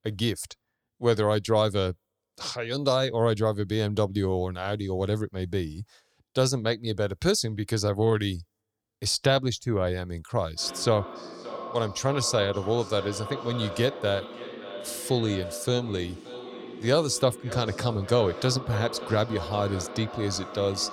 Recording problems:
echo of what is said; strong; from 11 s on; 570 ms later, 10 dB below the speech

